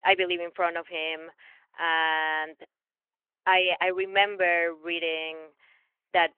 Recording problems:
phone-call audio; nothing above 3 kHz

